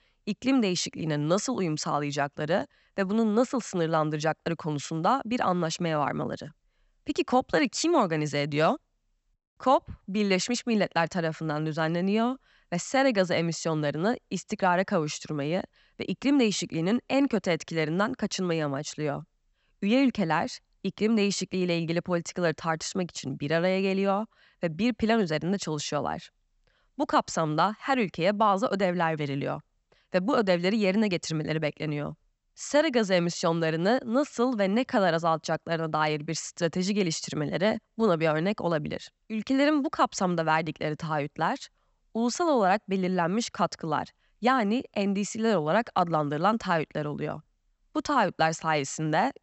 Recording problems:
high frequencies cut off; noticeable; nothing above 8 kHz

